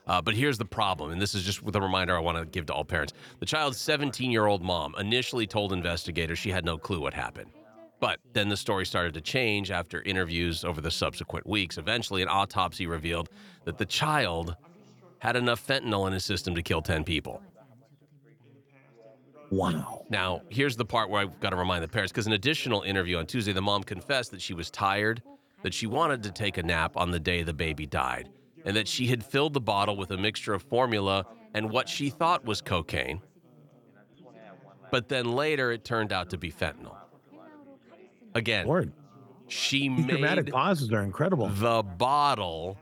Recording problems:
background chatter; faint; throughout; 3 voices, 25 dB below the speech

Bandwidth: 18.5 kHz